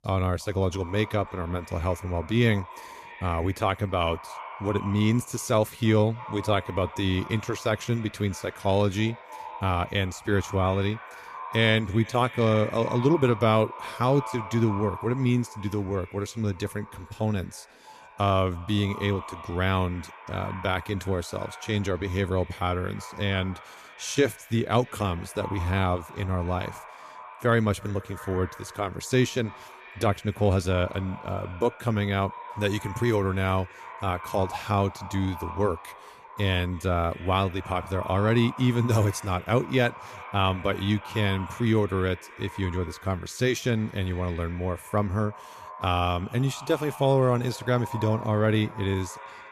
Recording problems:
echo of what is said; noticeable; throughout; 320 ms later, 15 dB below the speech

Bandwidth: 14.5 kHz